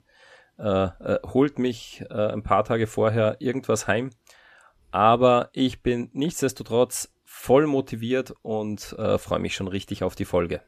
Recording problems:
none

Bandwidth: 14.5 kHz